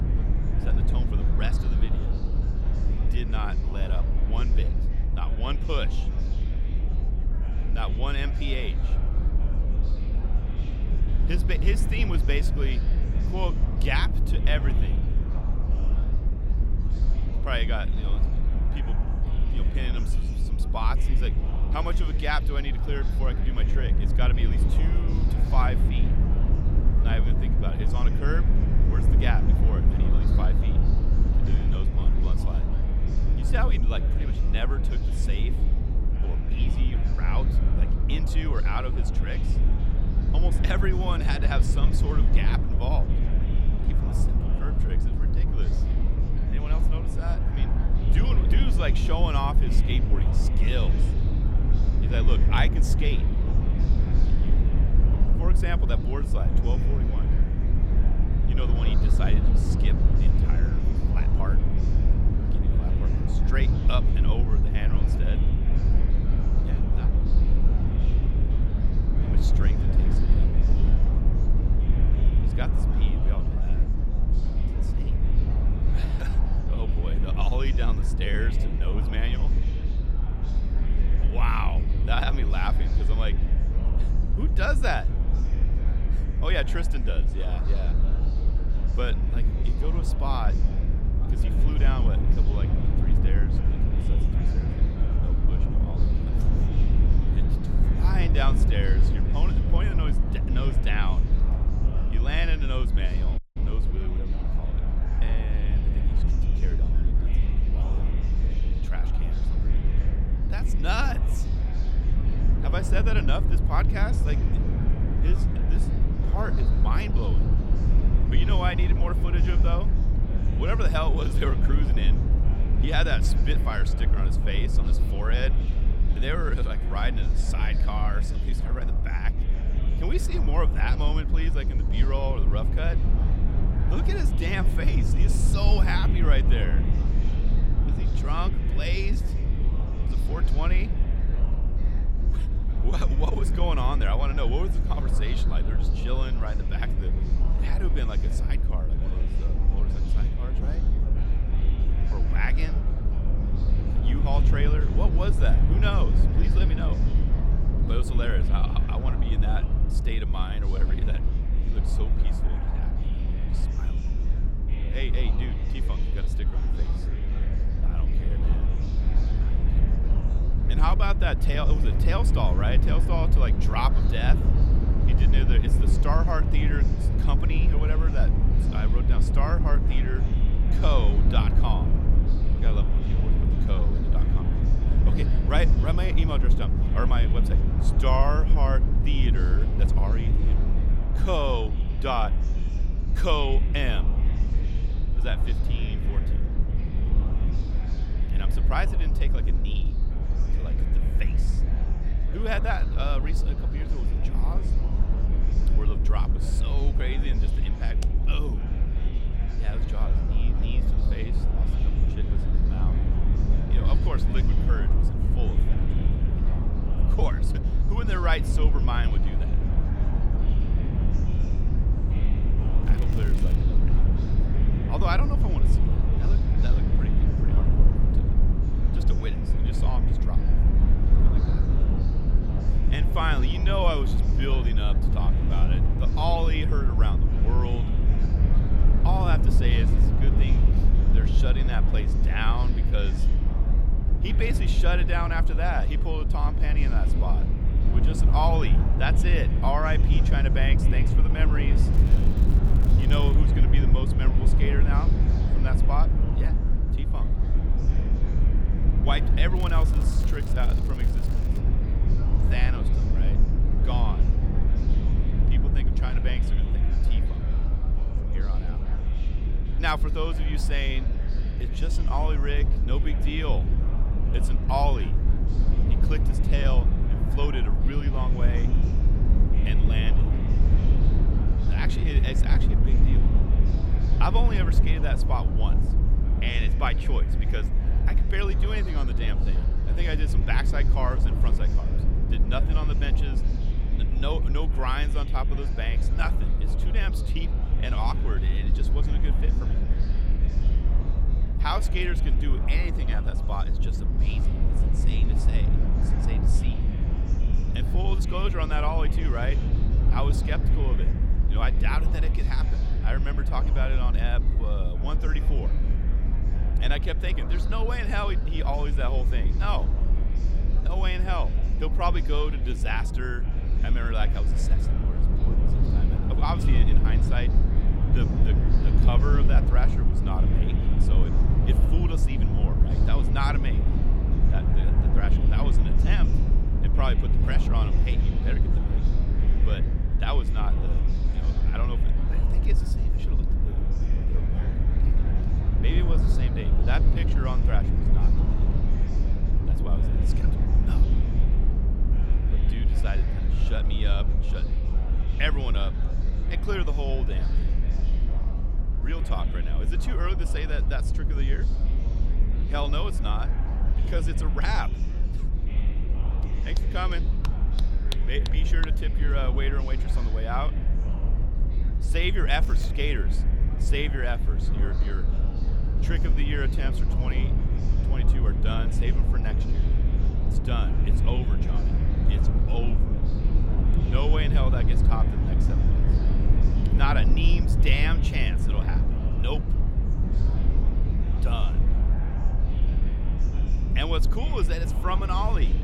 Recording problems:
chatter from many people; loud; throughout; 10 dB below the speech
low rumble; loud; throughout; 7 dB below the speech
electrical hum; faint; throughout; 50 Hz, 25 dB below the speech
crackling; very faint; 4 times, first at 3:43; 15 dB below the speech
audio cutting out; at 1:43

